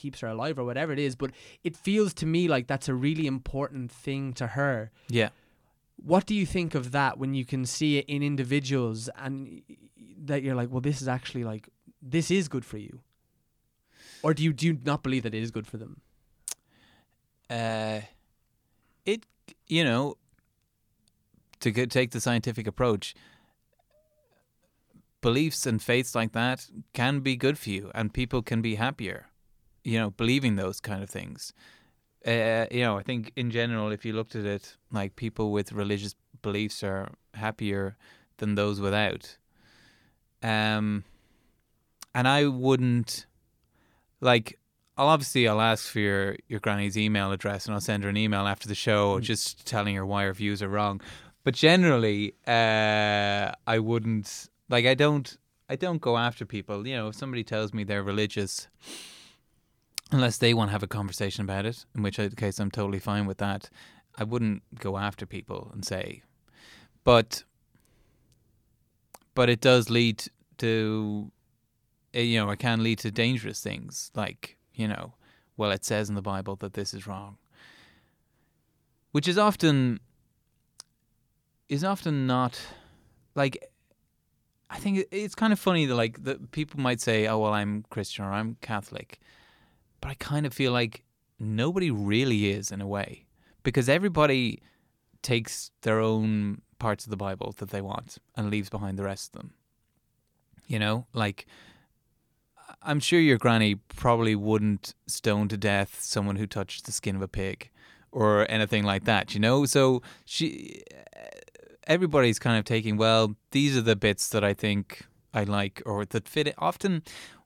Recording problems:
none

